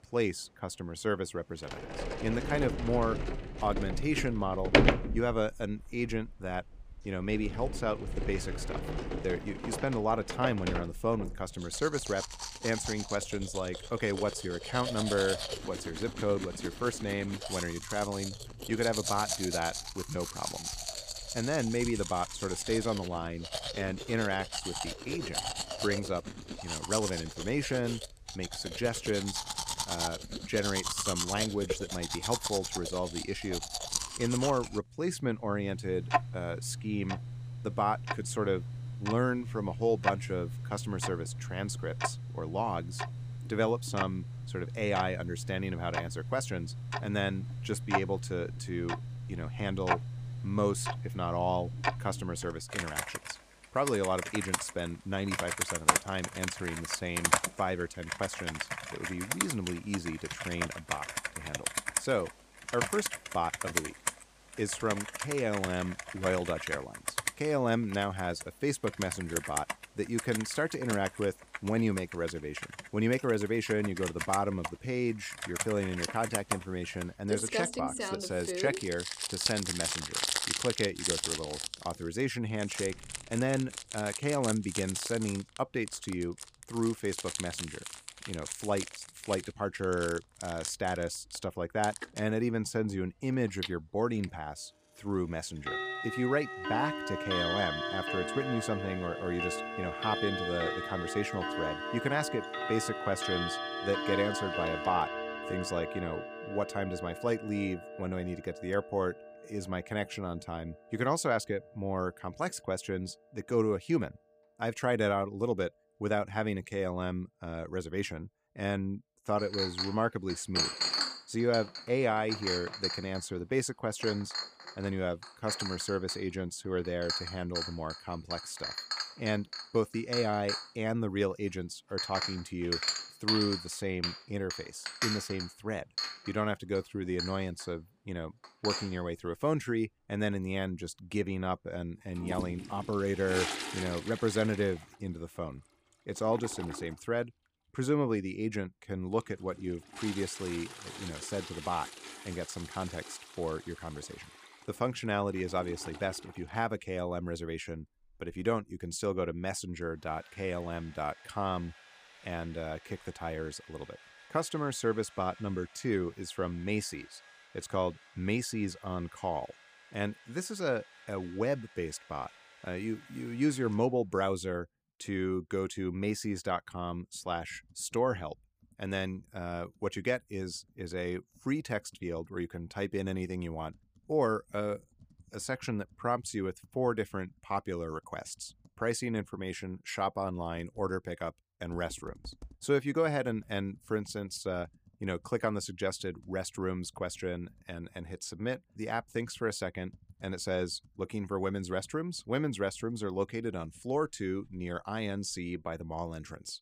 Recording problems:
household noises; loud; throughout; 2 dB below the speech

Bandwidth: 15 kHz